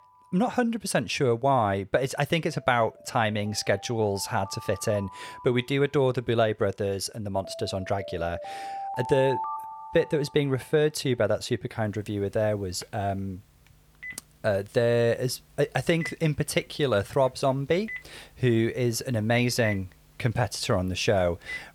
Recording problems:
alarms or sirens; noticeable; throughout; 10 dB below the speech

